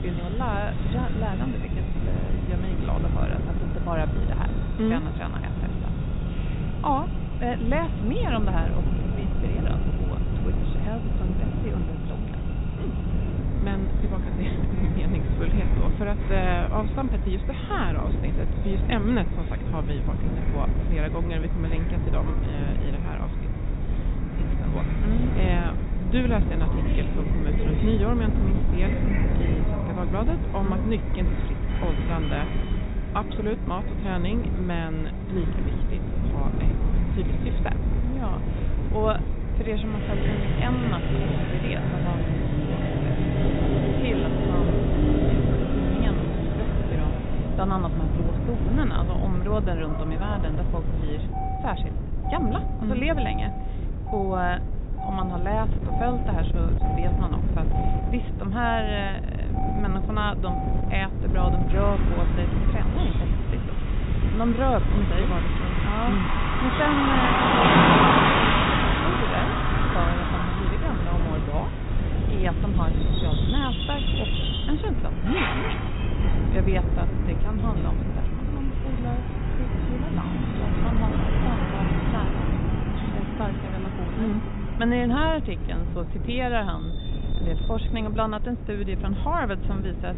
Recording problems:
high frequencies cut off; severe; nothing above 4 kHz
traffic noise; very loud; throughout; 1 dB above the speech
wind noise on the microphone; heavy; 7 dB below the speech

